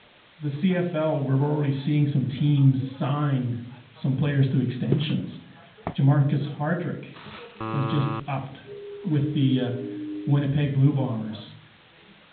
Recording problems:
high frequencies cut off; severe; nothing above 4 kHz
room echo; slight; dies away in 0.5 s
off-mic speech; somewhat distant
chatter from many people; faint; throughout; 30 dB below the speech
hiss; faint; throughout; 30 dB below the speech
footsteps; noticeable; at 5 s; peak 6 dB below the speech
alarm; noticeable; at 7.5 s; peak 5 dB below the speech
siren; noticeable; from 8.5 to 10 s; peak 9 dB below the speech

